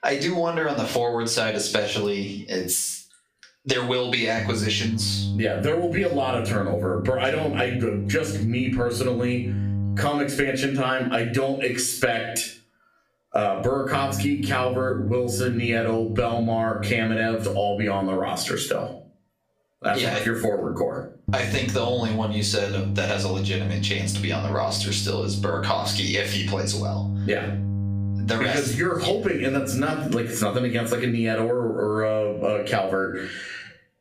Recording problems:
off-mic speech; far
squashed, flat; heavily
room echo; slight; dies away in 0.3 s
electrical hum; noticeable; from 4.5 to 10 s, from 14 to 18 s and from 21 to 30 s; 50 Hz, 15 dB below the speech

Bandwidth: 15 kHz